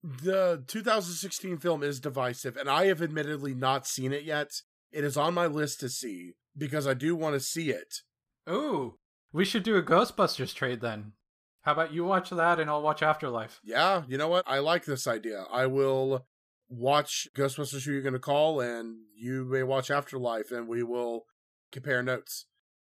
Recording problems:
none

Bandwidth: 14.5 kHz